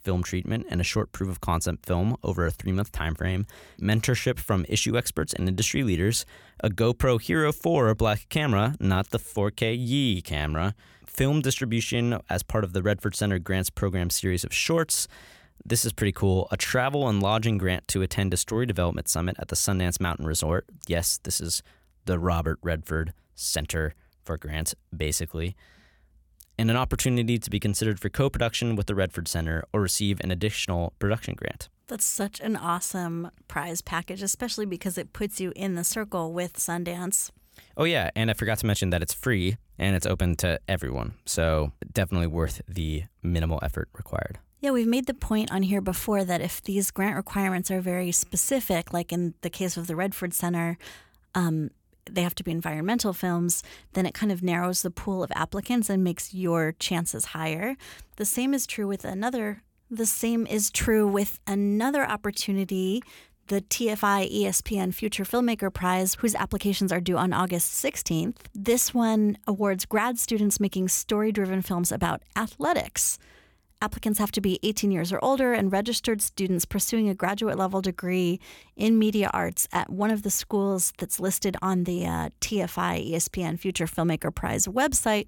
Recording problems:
none

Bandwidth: 18 kHz